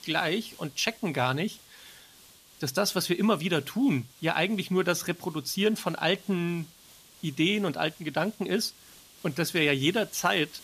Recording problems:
hiss; faint; throughout; 25 dB below the speech

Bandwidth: 14.5 kHz